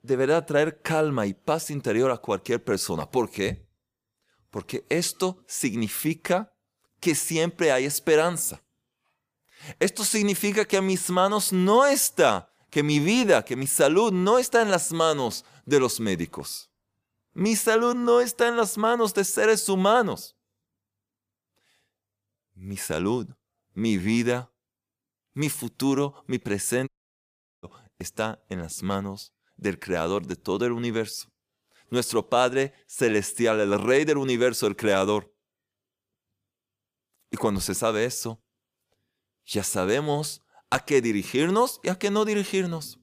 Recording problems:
audio cutting out; at 27 s for 1 s

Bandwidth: 15 kHz